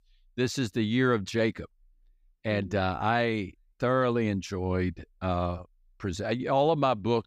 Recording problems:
none

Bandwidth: 15.5 kHz